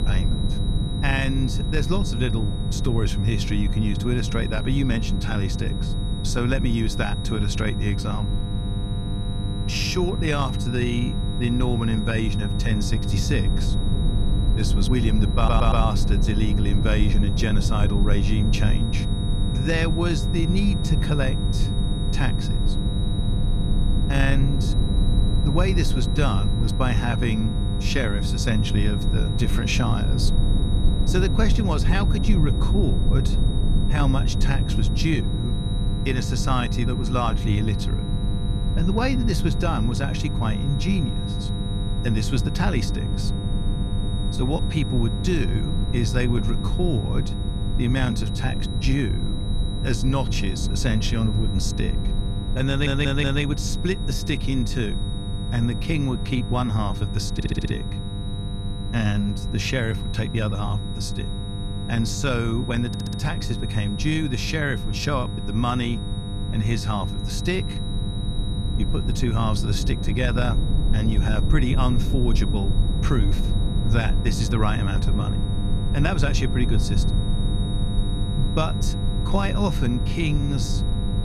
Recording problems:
low rumble; loud; throughout; 10 dB below the speech
electrical hum; noticeable; throughout; 50 Hz, 10 dB below the speech
high-pitched whine; noticeable; throughout; 4 kHz, 10 dB below the speech
audio stuttering; 4 times, first at 15 s

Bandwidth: 14.5 kHz